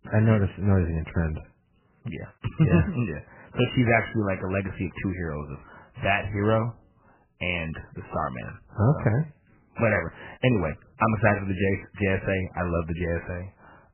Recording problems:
garbled, watery; badly; nothing above 3 kHz

